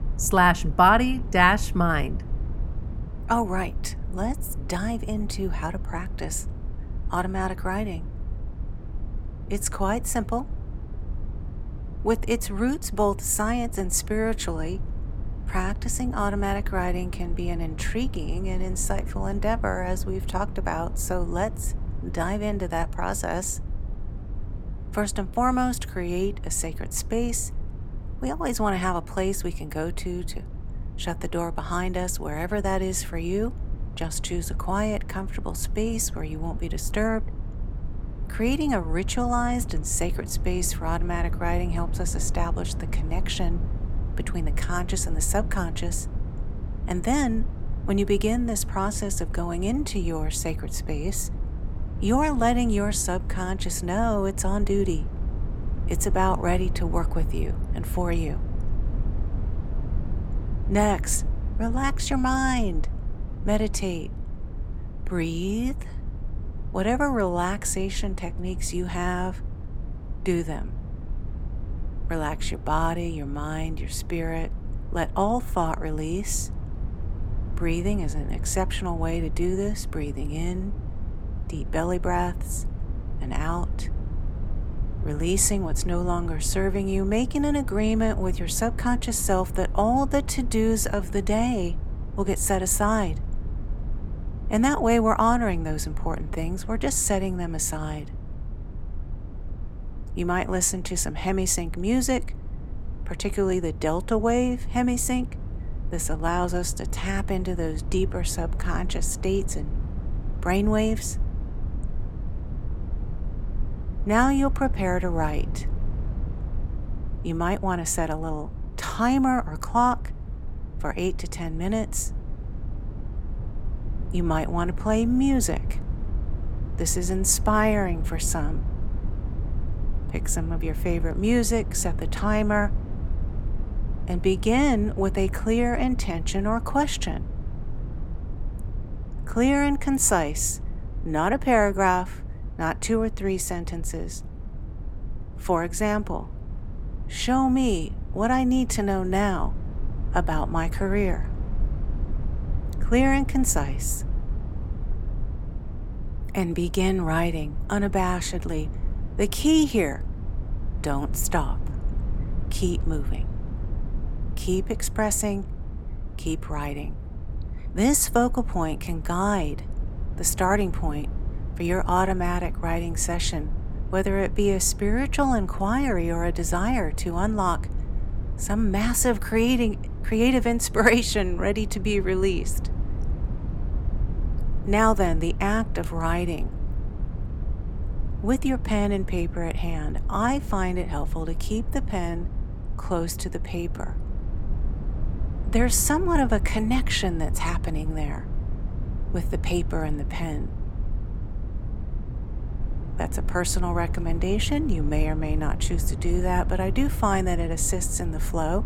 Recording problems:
low rumble; noticeable; throughout; 20 dB below the speech

